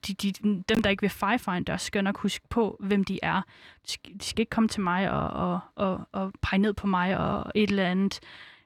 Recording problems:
none

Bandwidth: 17.5 kHz